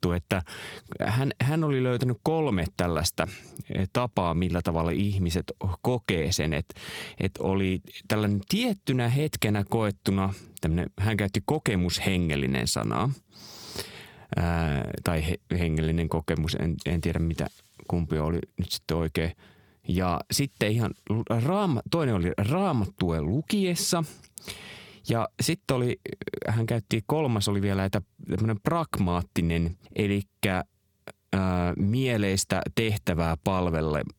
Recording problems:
squashed, flat; heavily

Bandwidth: 18.5 kHz